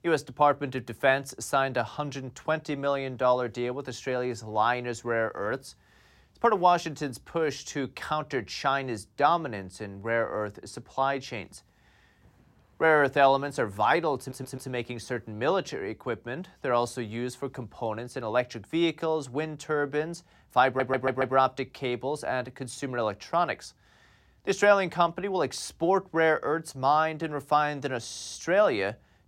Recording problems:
audio stuttering; at 14 s, at 21 s and at 28 s

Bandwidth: 16 kHz